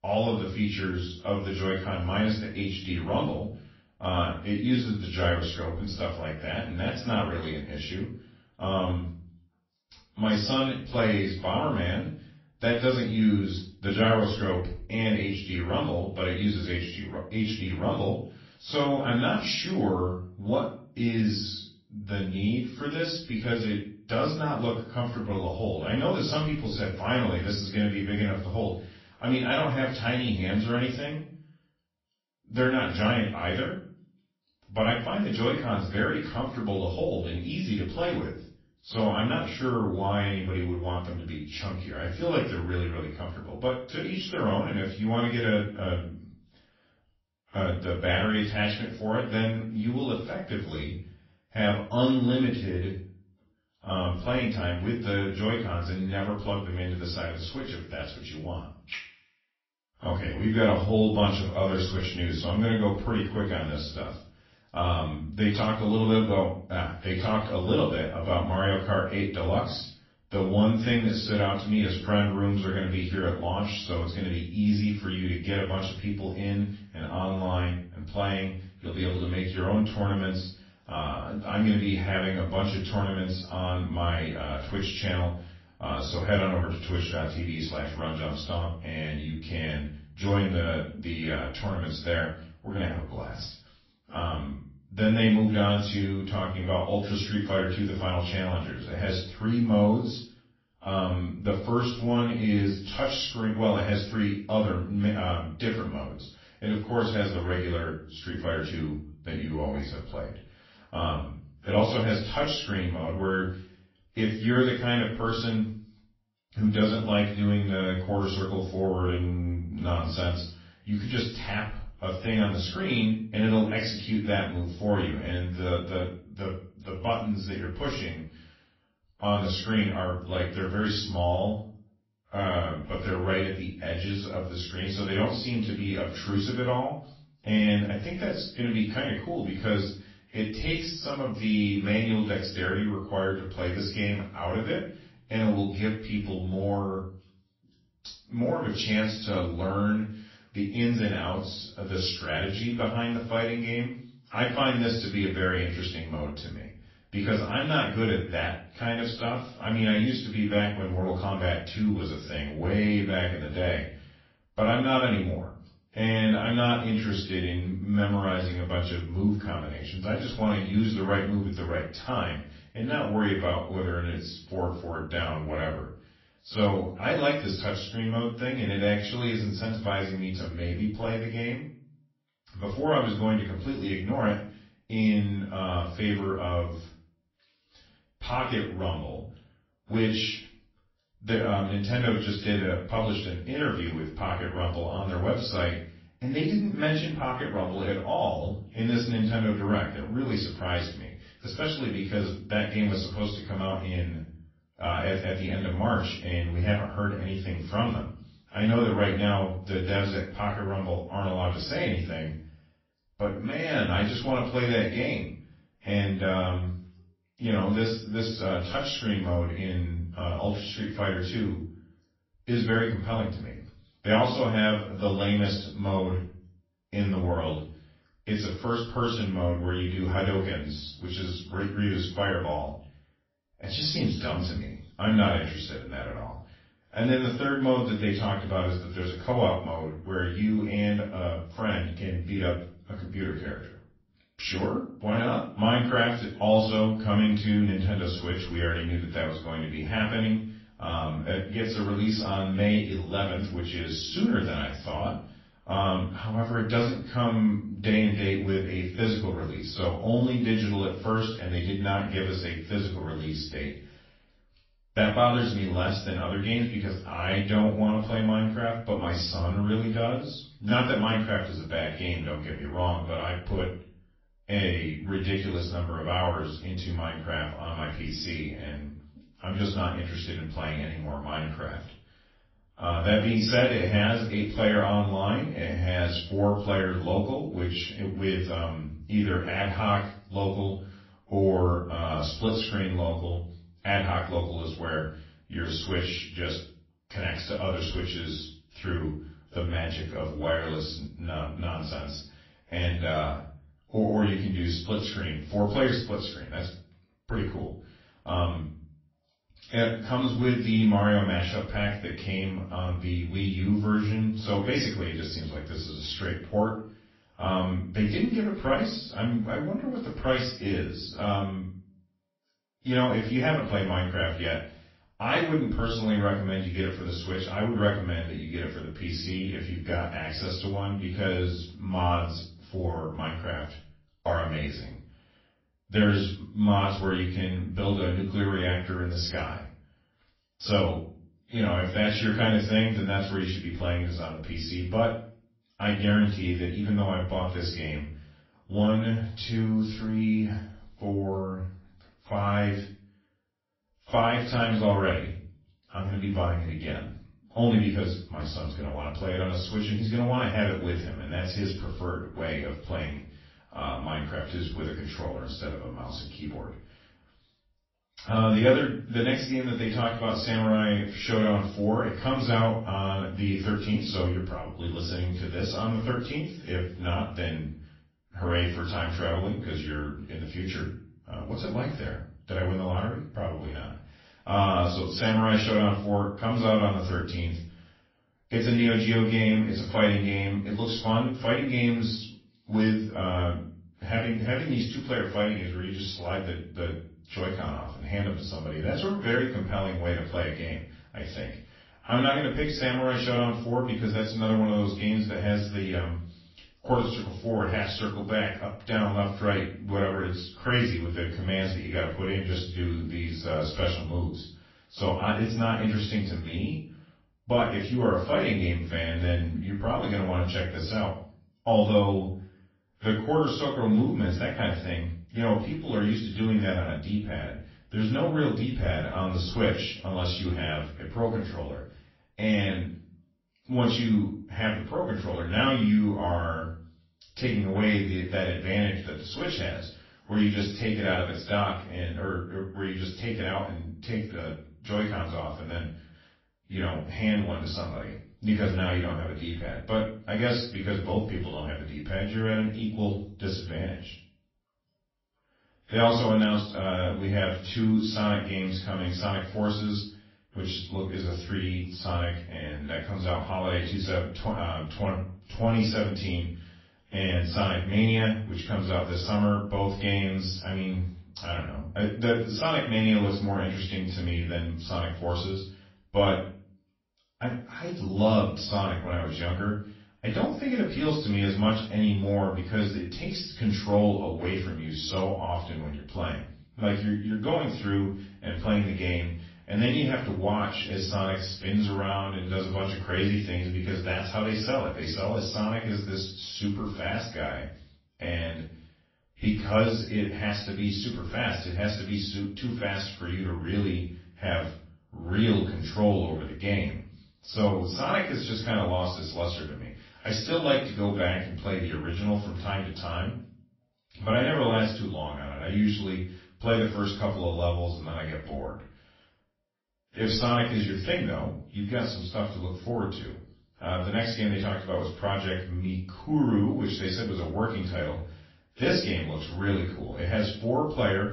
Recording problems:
off-mic speech; far
room echo; slight; dies away in 0.4 s
garbled, watery; slightly; nothing above 5.5 kHz

